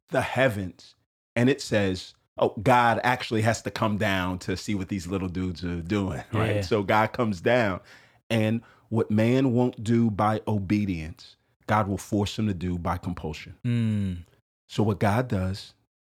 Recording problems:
none

